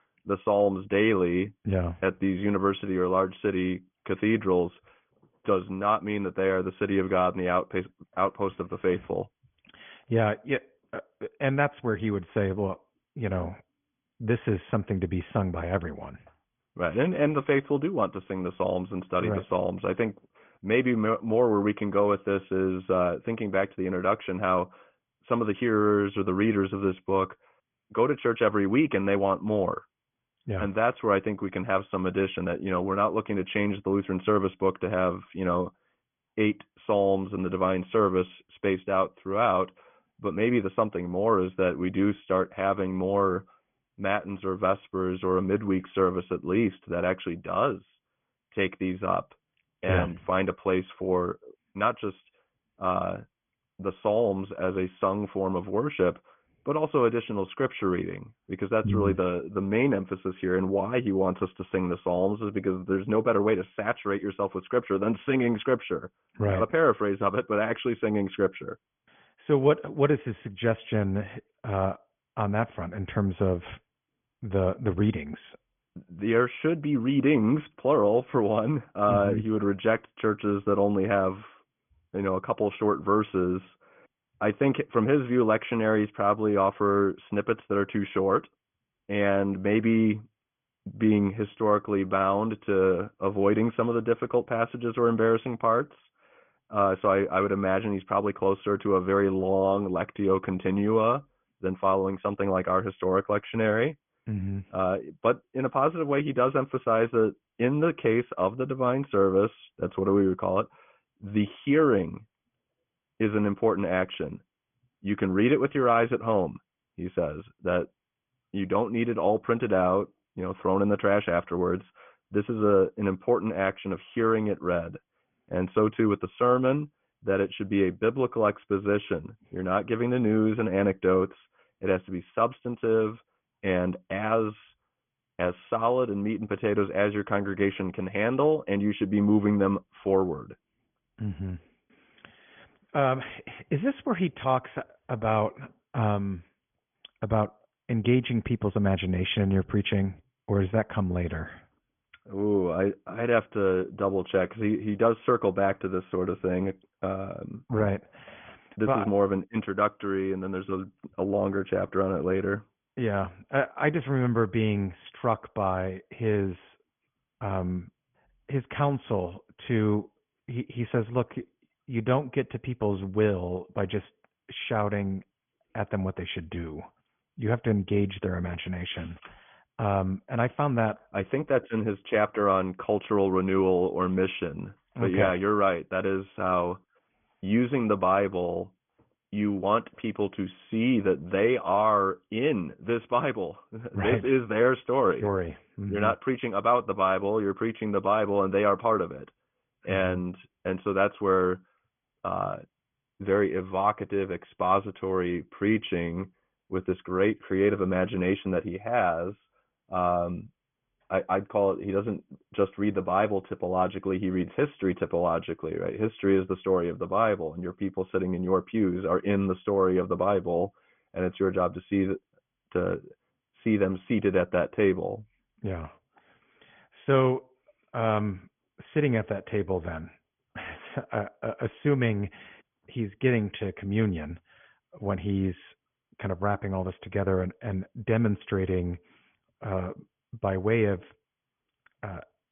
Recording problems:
high frequencies cut off; severe; nothing above 3.5 kHz
garbled, watery; slightly

